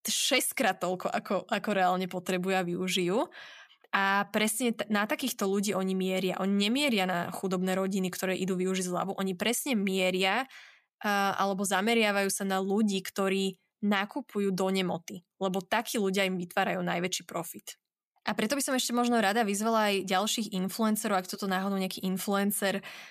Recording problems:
none

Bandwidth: 14.5 kHz